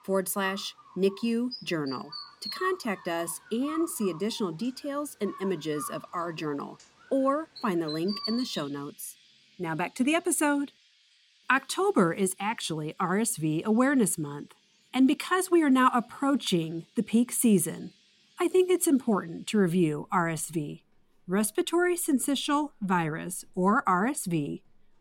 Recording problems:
animal sounds; noticeable; throughout; 15 dB below the speech

